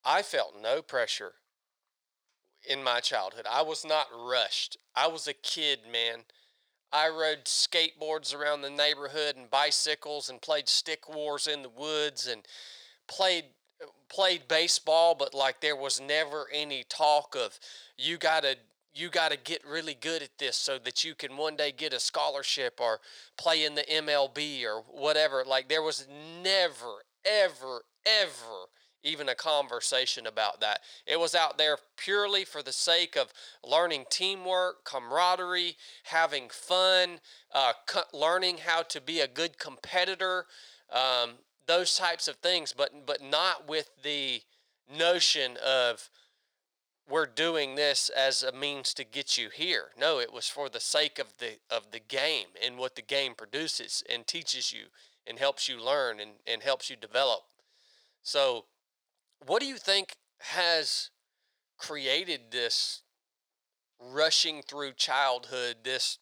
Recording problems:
thin; very; fading below 650 Hz

